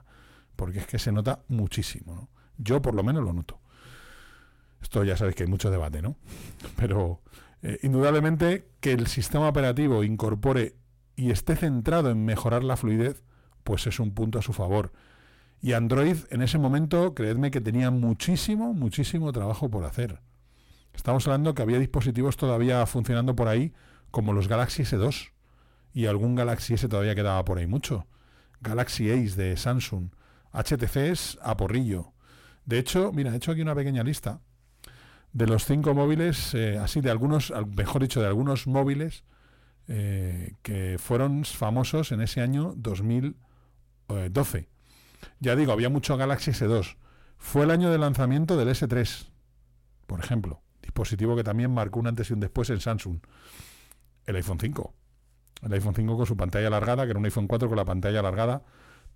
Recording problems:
distortion; slight; 10 dB below the speech

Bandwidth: 16.5 kHz